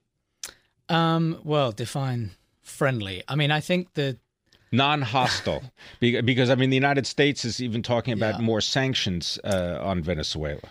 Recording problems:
none

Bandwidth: 15.5 kHz